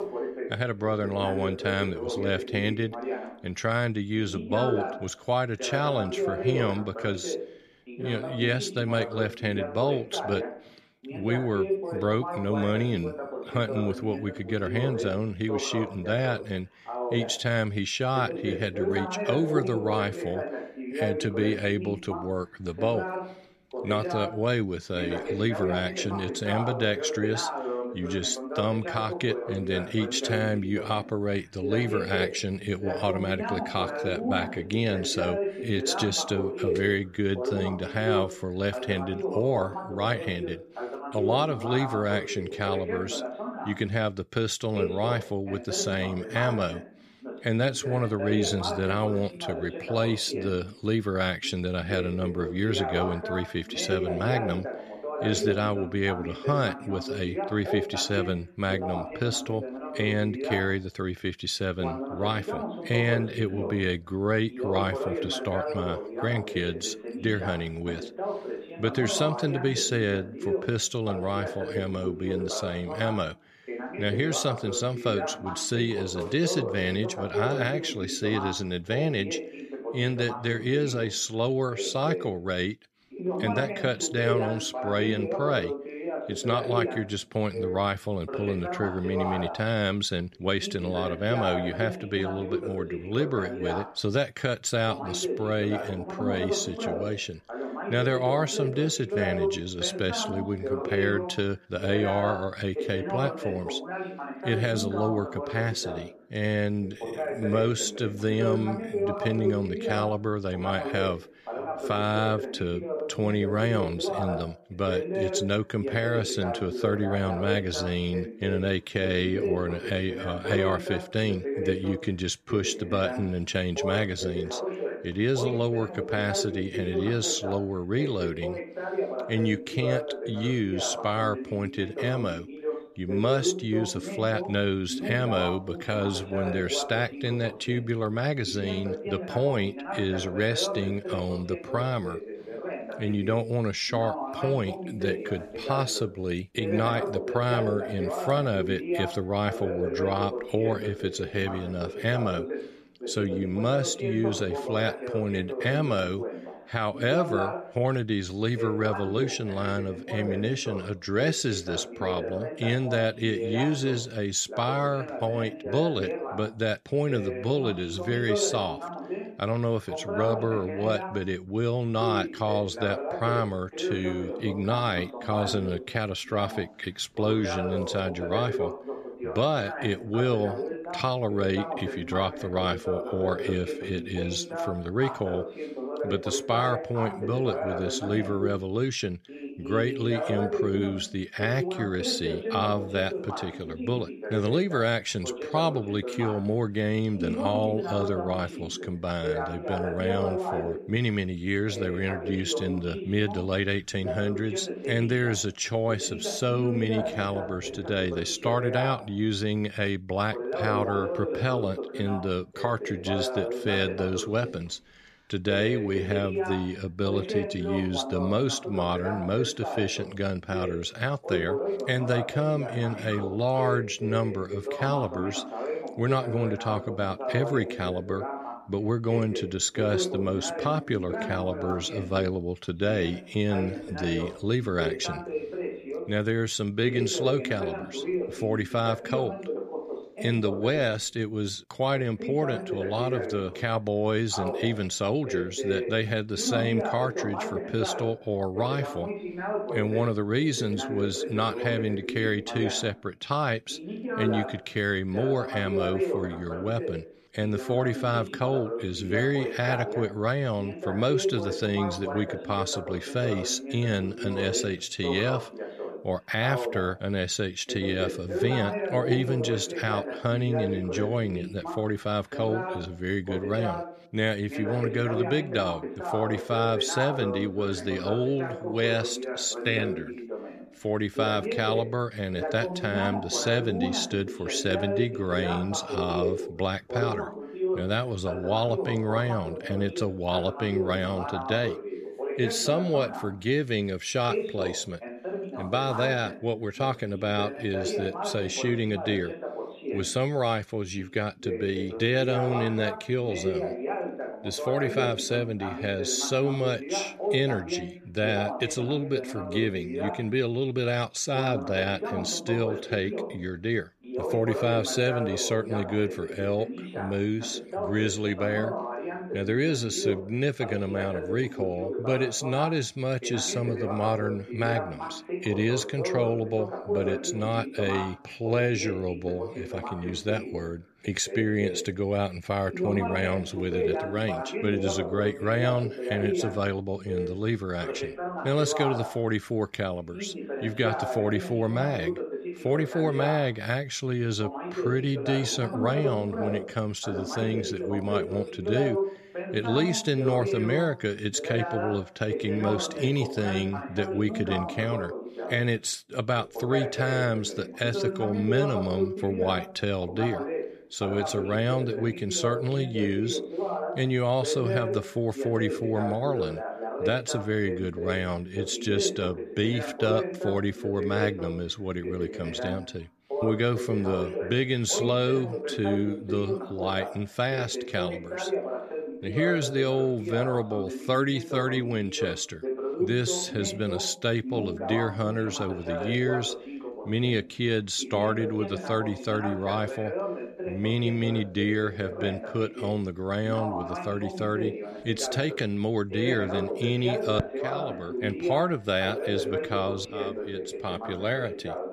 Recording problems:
voice in the background; loud; throughout; 5 dB below the speech

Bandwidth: 14.5 kHz